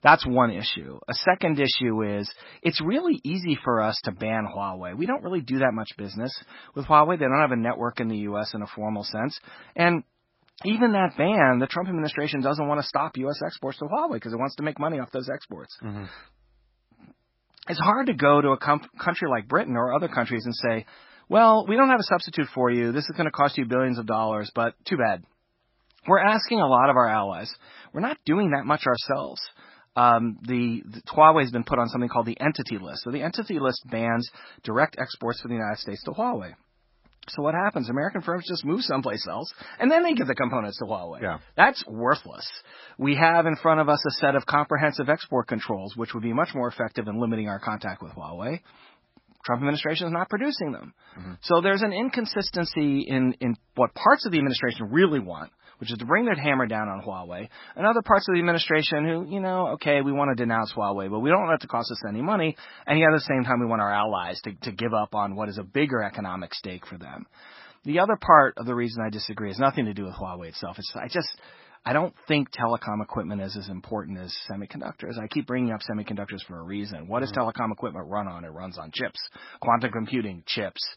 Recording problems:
garbled, watery; badly; nothing above 5.5 kHz

